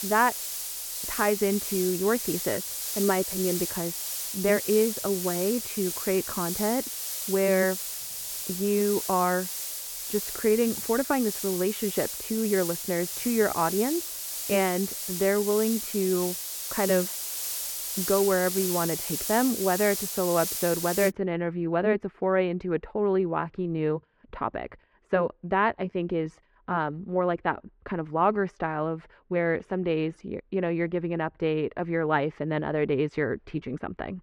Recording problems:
muffled; very; fading above 2 kHz
hiss; loud; until 21 s; 3 dB below the speech
uneven, jittery; strongly; from 4 to 30 s

